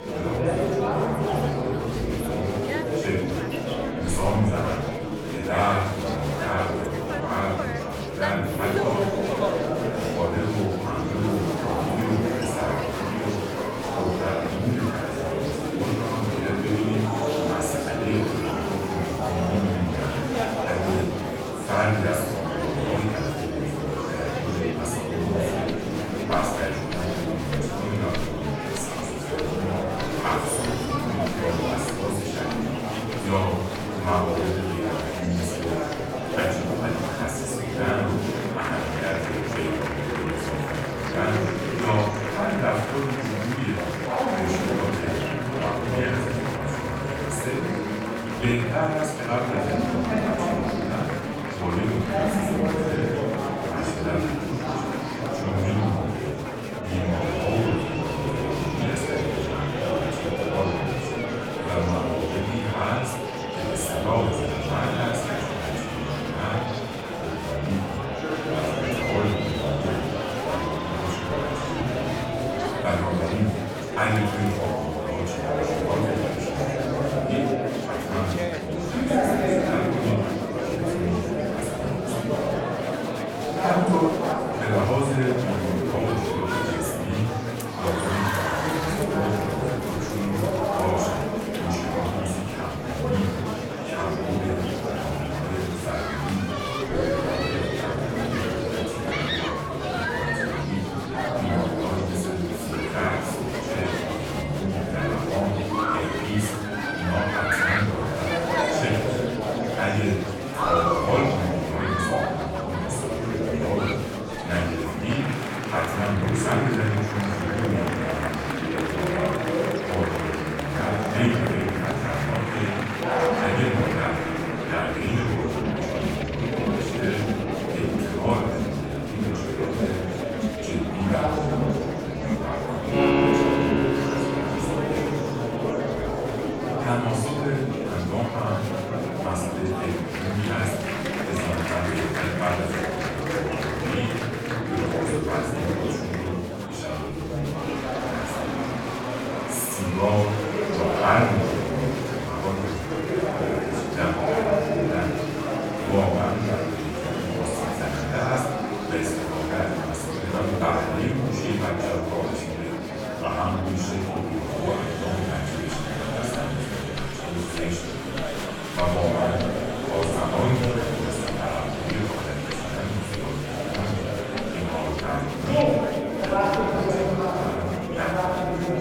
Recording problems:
off-mic speech; far
room echo; noticeable; dies away in 0.8 s
murmuring crowd; very loud; throughout; 1 dB above the speech
background music; loud; throughout; 9 dB below the speech

